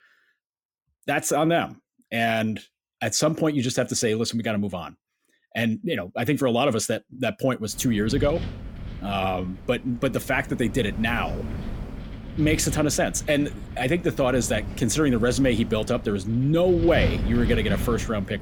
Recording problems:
wind noise on the microphone; occasional gusts; from 7.5 s on; 15 dB below the speech

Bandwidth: 17 kHz